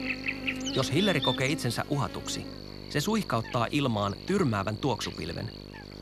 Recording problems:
electrical hum; loud; throughout; 50 Hz, 6 dB below the speech

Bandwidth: 14 kHz